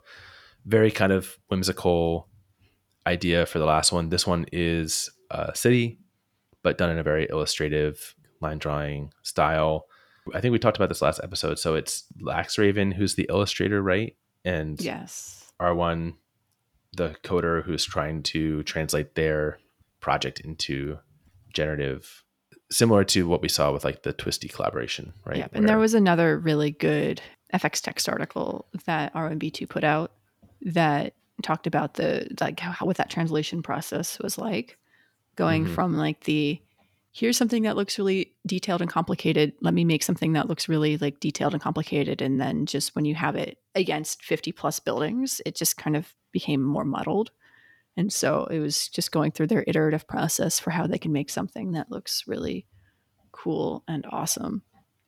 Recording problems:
none

